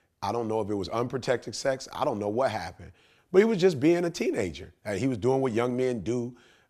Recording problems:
none

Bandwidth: 14.5 kHz